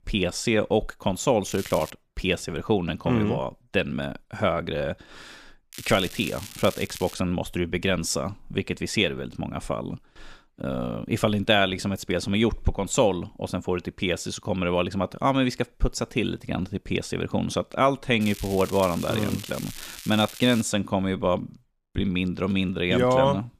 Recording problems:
crackling; noticeable; at 1.5 s, from 5.5 to 7 s and from 18 to 21 s; 15 dB below the speech

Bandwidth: 14.5 kHz